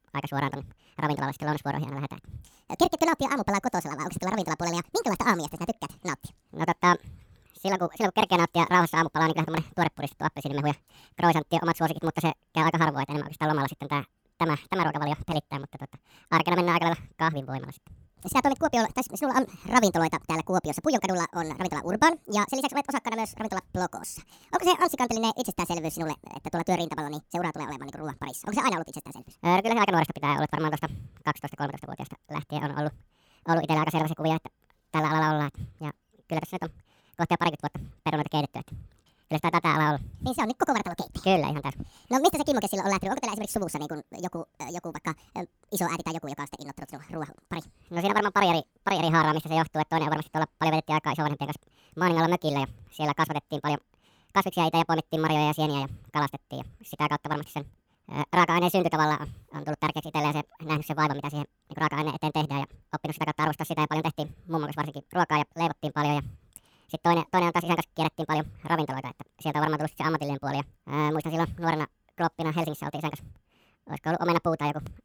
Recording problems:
wrong speed and pitch; too fast and too high; 1.7 times normal speed

